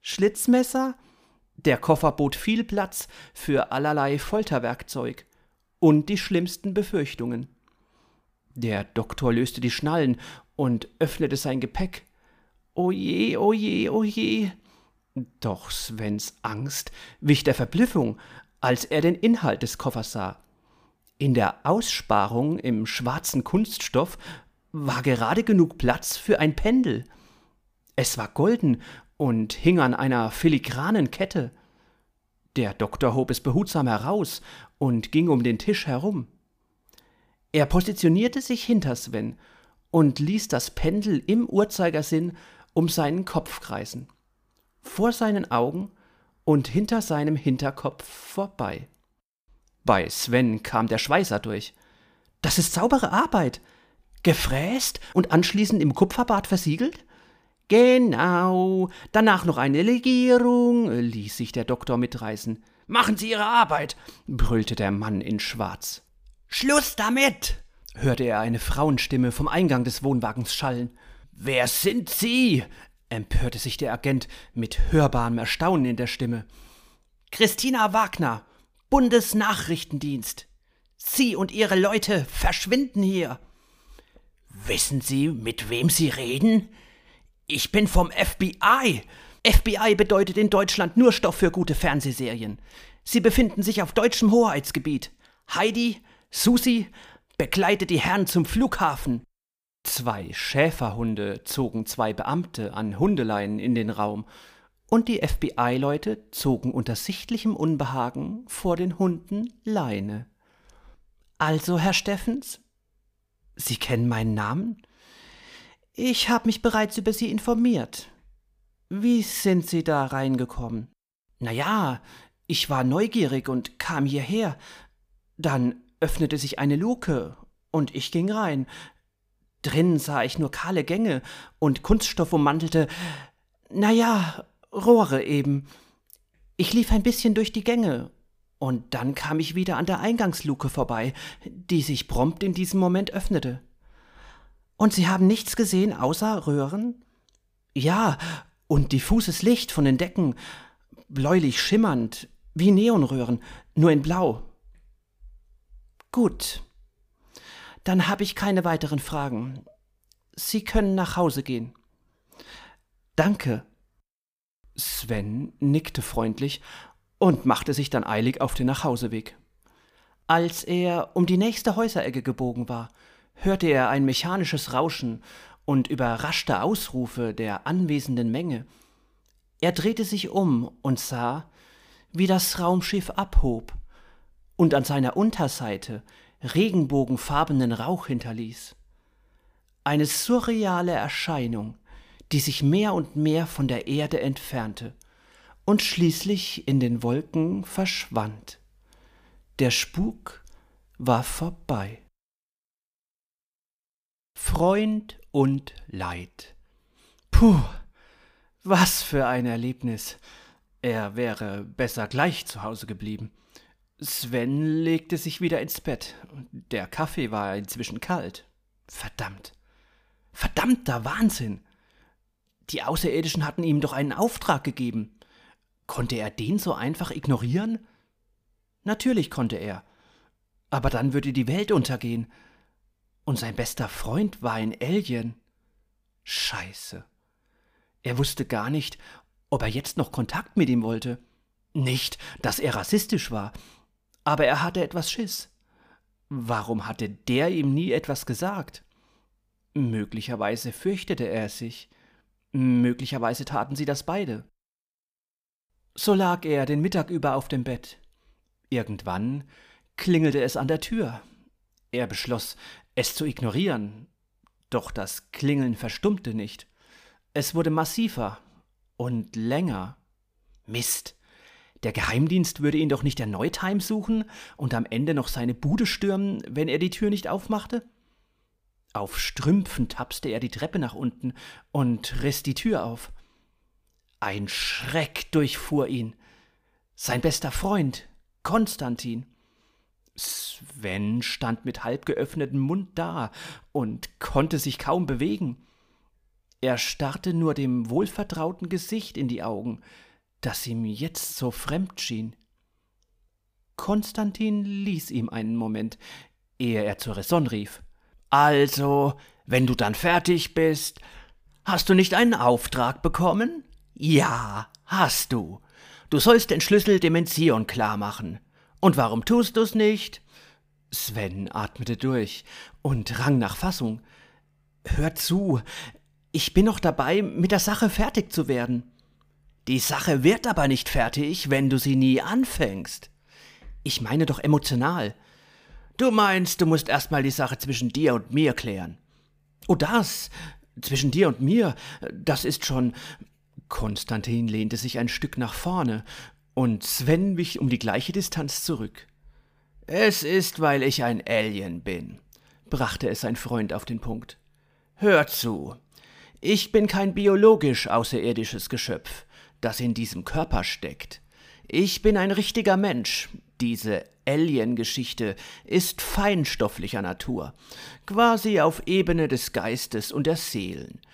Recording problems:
none

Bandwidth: 15 kHz